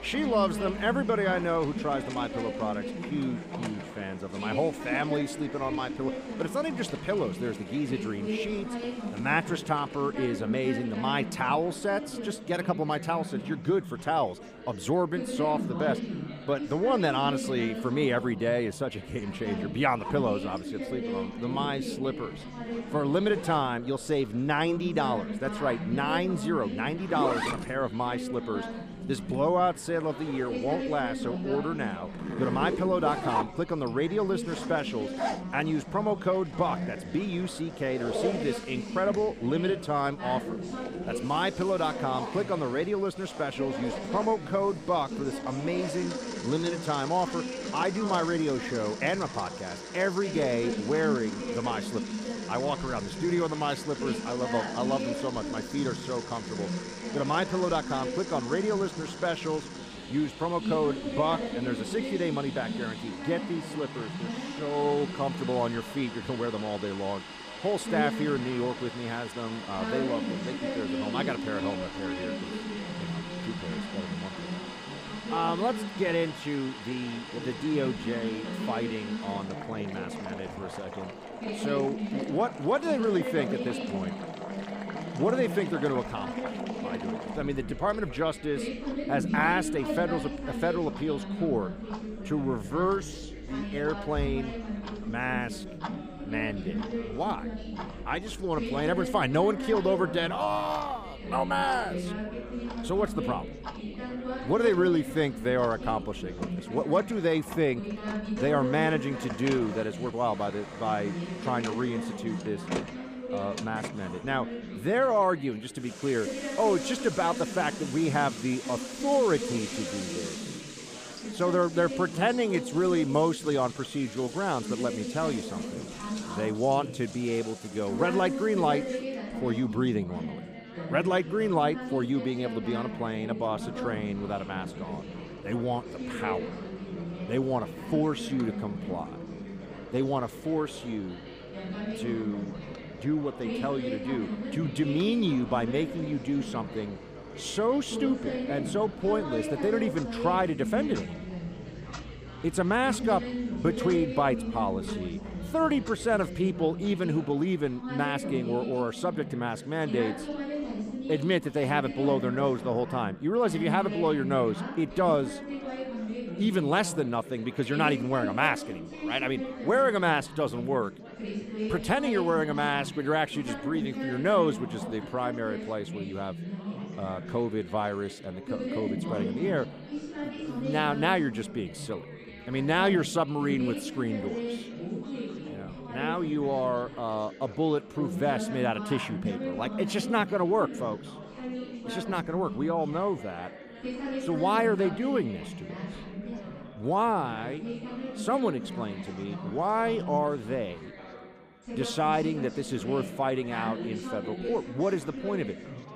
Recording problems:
chatter from many people; loud; throughout; 7 dB below the speech
household noises; noticeable; until 2:37; 10 dB below the speech

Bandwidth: 15 kHz